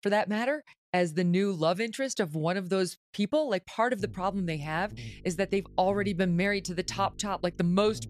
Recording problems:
electrical hum; faint; from 4 s on; 50 Hz, 25 dB below the speech

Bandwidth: 14 kHz